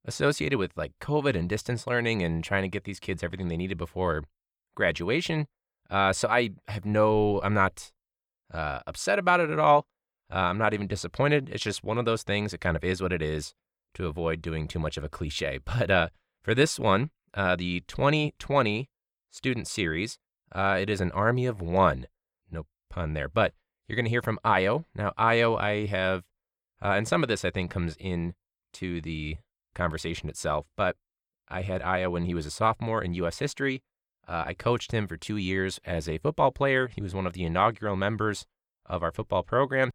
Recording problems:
none

